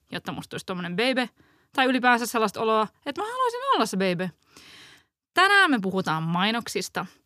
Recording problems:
none

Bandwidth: 15 kHz